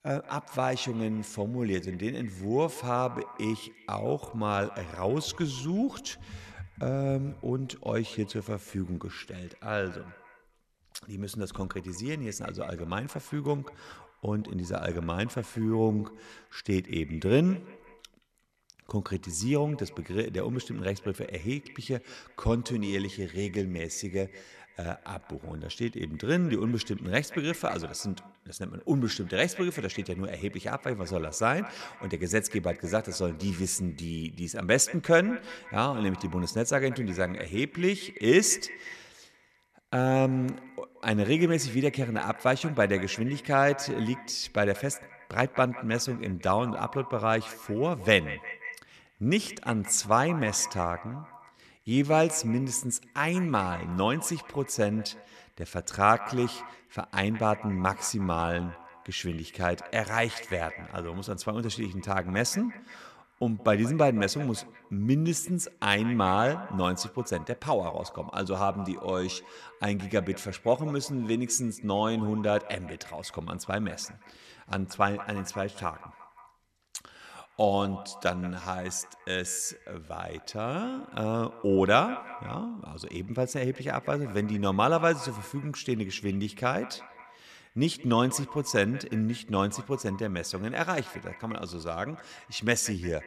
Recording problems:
echo of what is said; noticeable; throughout; 170 ms later, 15 dB below the speech

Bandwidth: 13.5 kHz